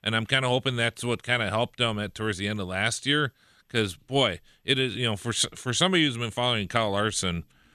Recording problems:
none

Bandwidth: 14 kHz